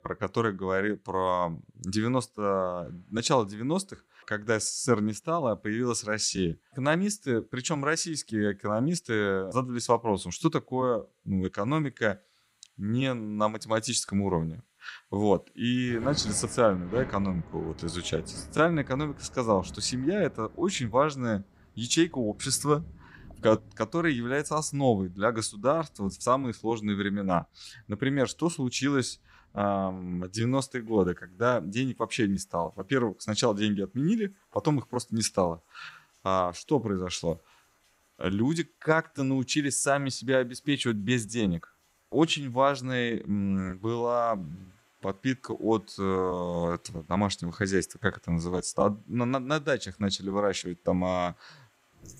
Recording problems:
rain or running water; noticeable; throughout; 20 dB below the speech

